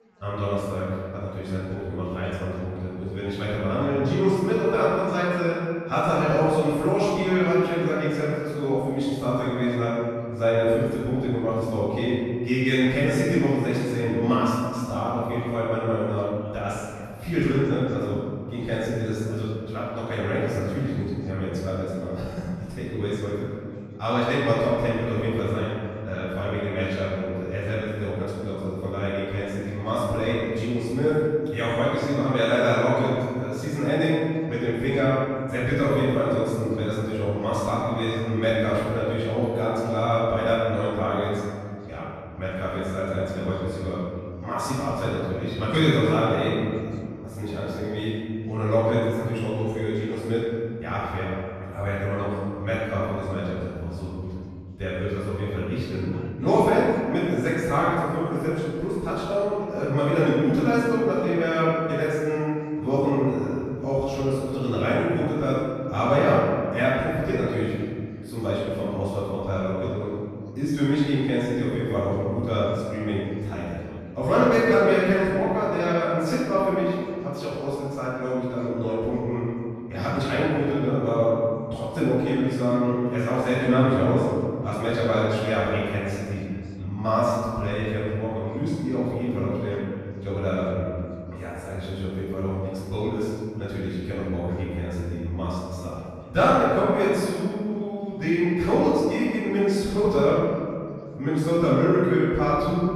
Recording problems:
room echo; strong; dies away in 1.9 s
off-mic speech; far
background chatter; faint; throughout; 4 voices, 30 dB below the speech

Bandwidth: 14 kHz